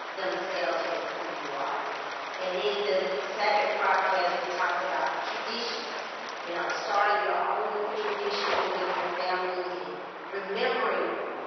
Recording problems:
room echo; strong; dies away in 2.2 s
off-mic speech; far
garbled, watery; badly; nothing above 5.5 kHz
thin; very; fading below 700 Hz
muffled; very slightly; fading above 2 kHz
rain or running water; loud; throughout; 5 dB below the speech

